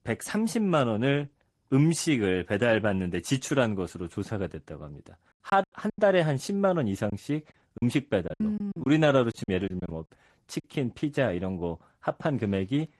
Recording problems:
garbled, watery; slightly; nothing above 12 kHz
choppy; very; at 5.5 s and from 7 to 11 s; 15% of the speech affected

